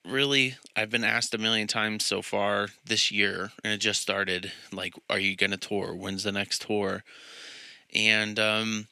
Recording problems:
thin; very slightly; fading below 750 Hz

